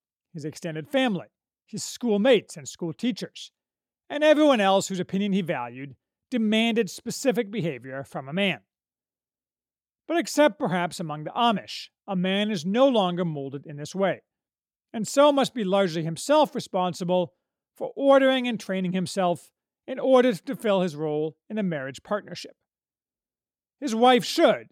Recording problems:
none

